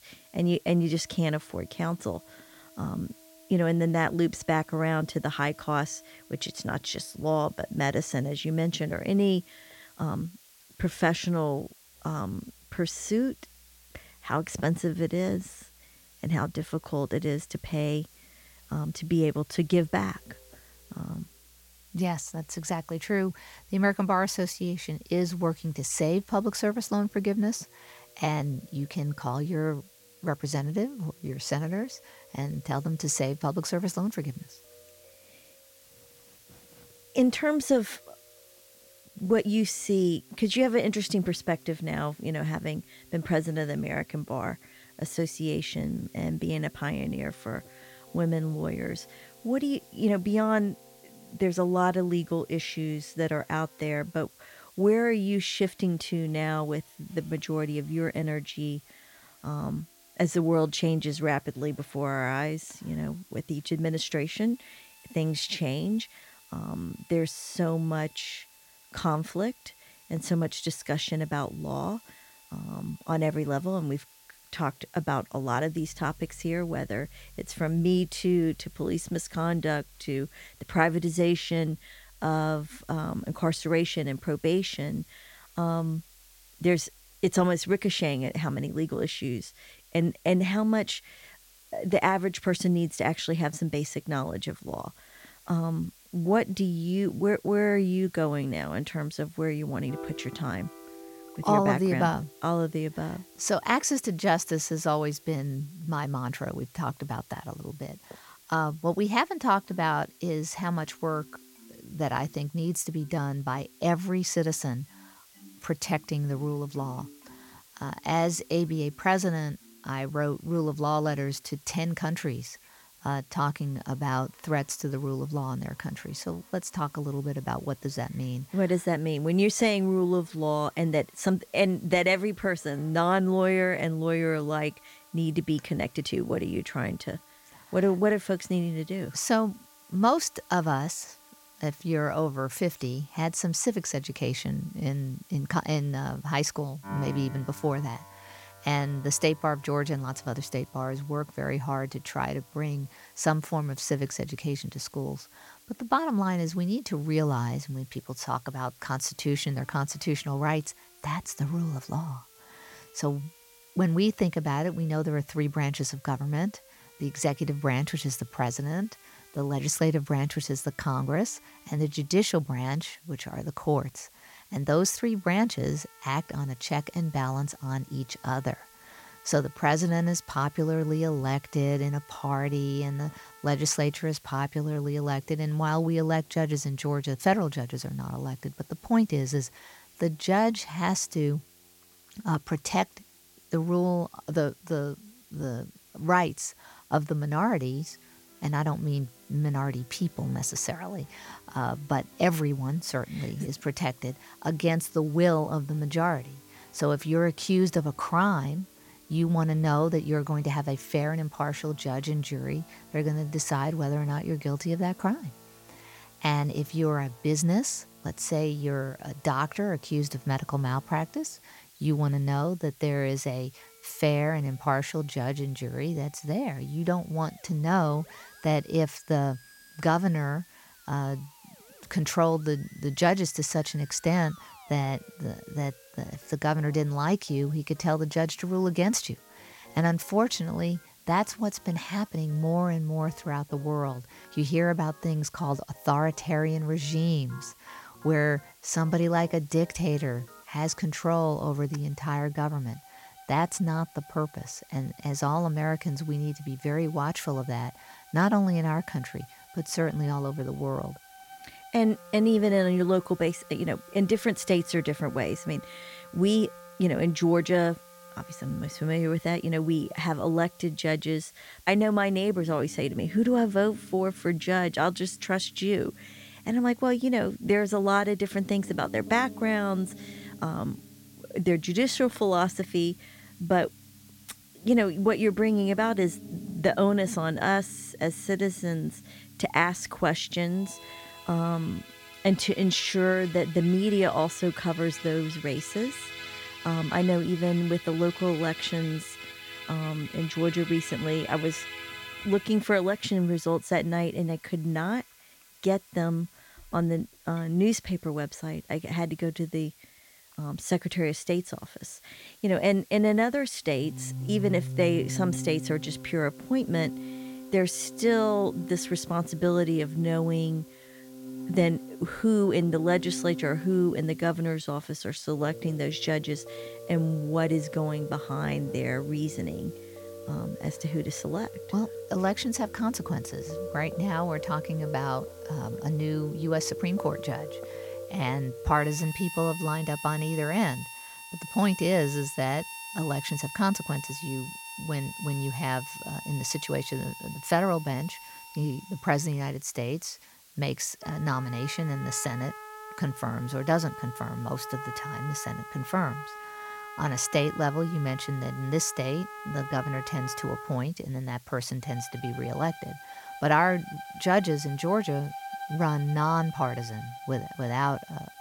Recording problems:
background music; noticeable; throughout; 15 dB below the speech
hiss; faint; throughout; 25 dB below the speech

